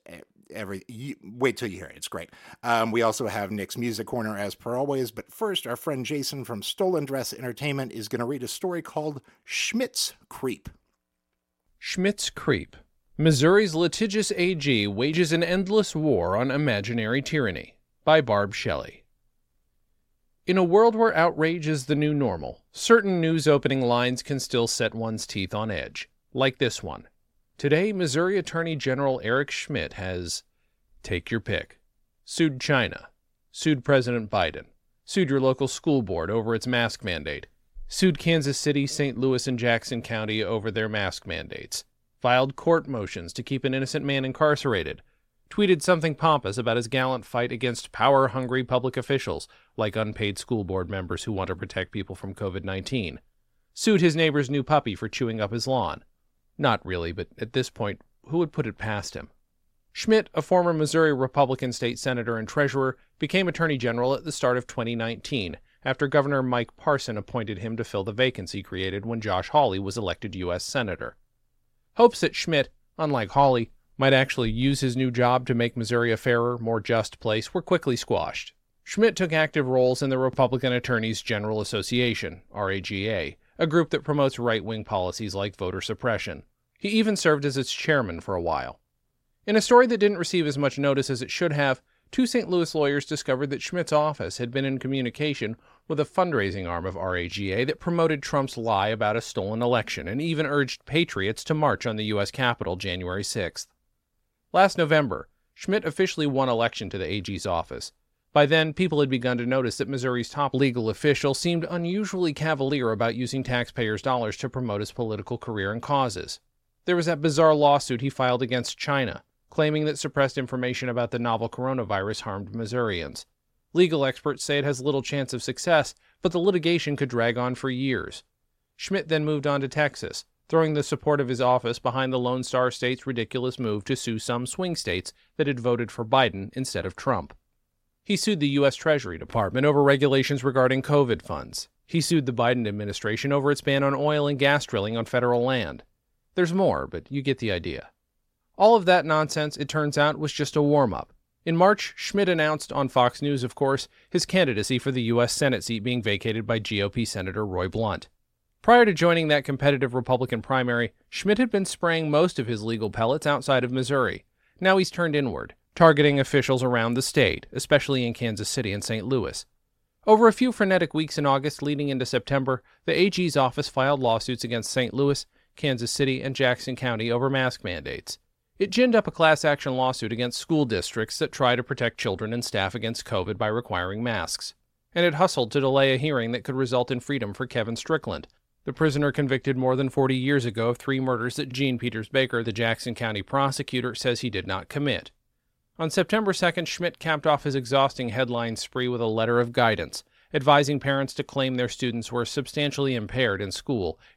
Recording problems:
none

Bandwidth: 16 kHz